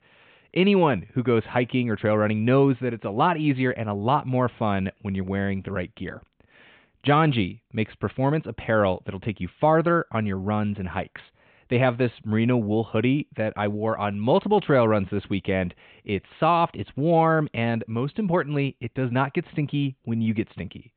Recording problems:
high frequencies cut off; severe; nothing above 4 kHz

